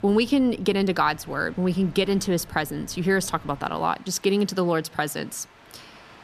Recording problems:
train or aircraft noise; faint; throughout; 25 dB below the speech

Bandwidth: 14.5 kHz